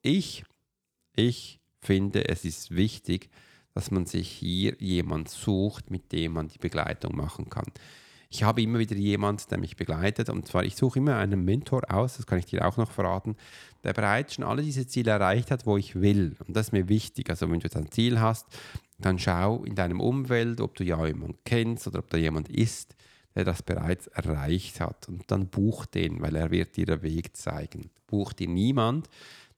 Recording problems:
none

